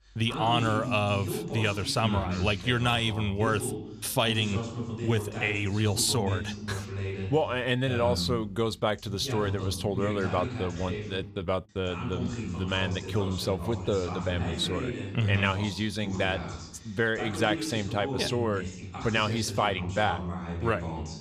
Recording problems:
voice in the background; loud; throughout; 7 dB below the speech

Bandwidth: 14 kHz